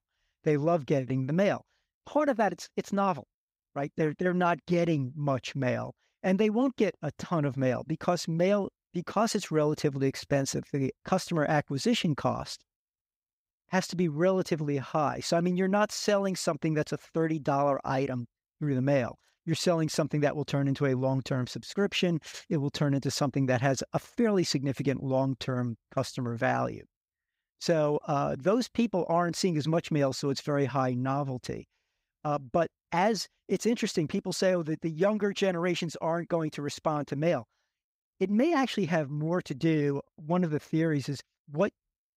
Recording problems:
none

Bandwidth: 15.5 kHz